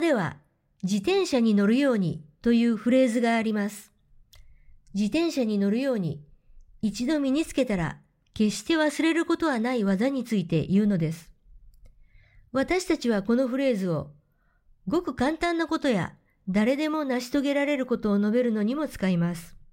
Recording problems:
abrupt cut into speech; at the start

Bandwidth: 16 kHz